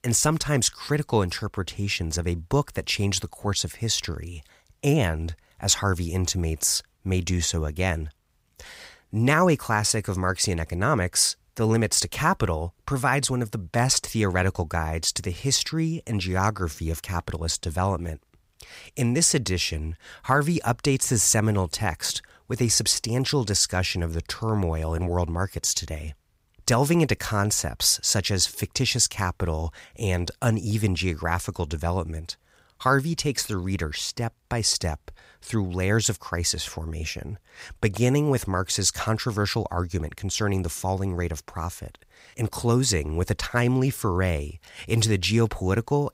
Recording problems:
none

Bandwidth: 15.5 kHz